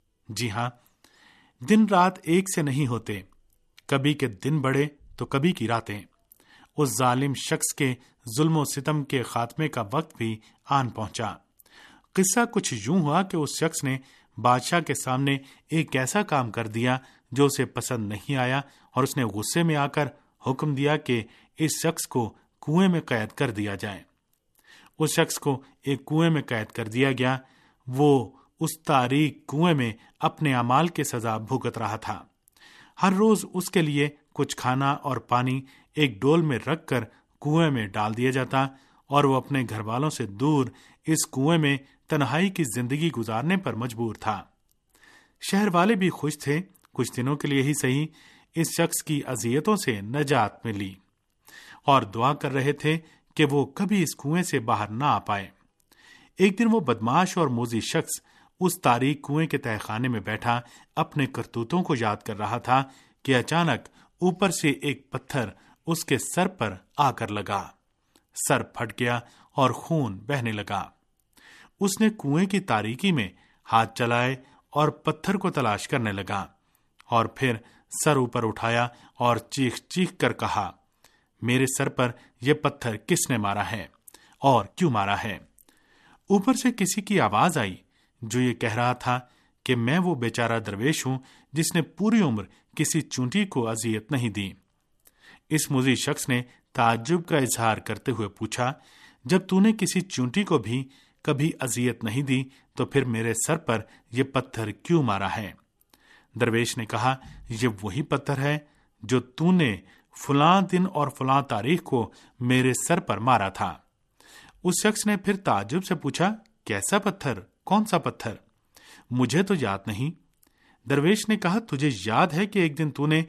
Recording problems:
uneven, jittery; strongly; from 5 s to 1:53

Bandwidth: 13.5 kHz